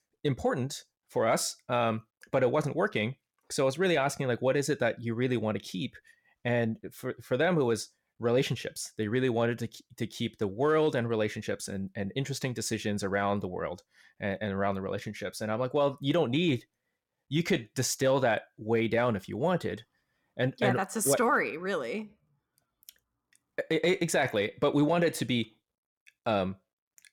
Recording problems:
none

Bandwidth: 17 kHz